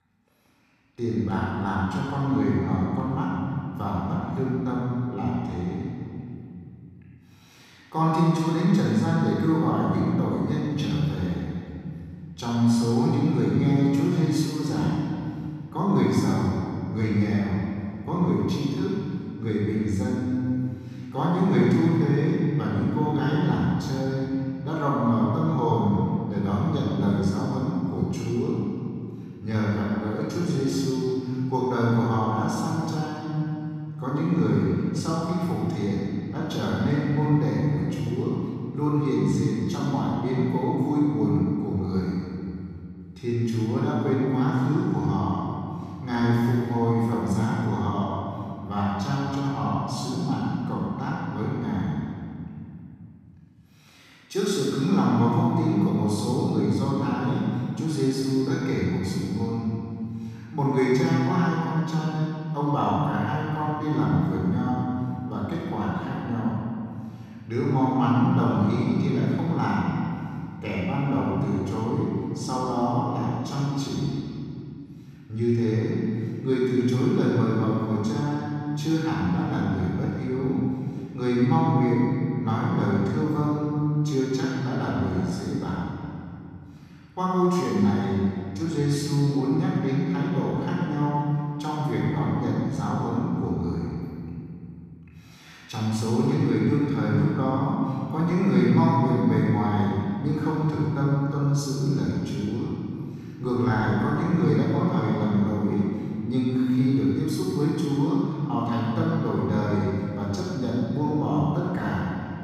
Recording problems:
room echo; strong; dies away in 2.5 s
off-mic speech; far

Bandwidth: 15 kHz